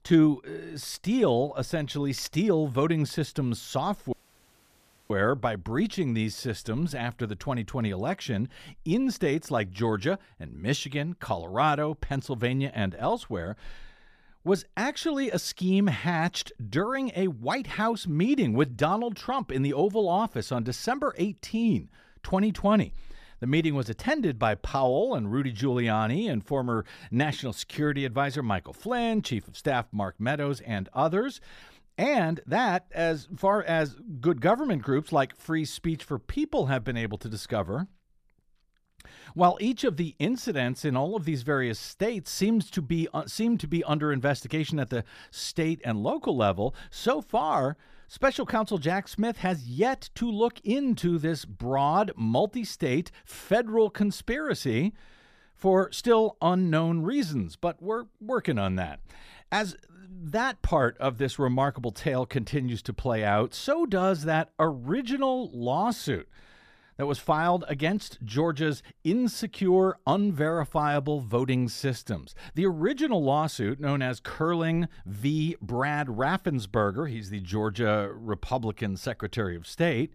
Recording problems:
audio cutting out; at 4 s for 1 s

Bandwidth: 14.5 kHz